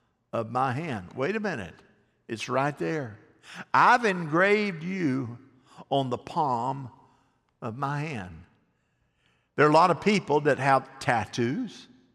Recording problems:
none

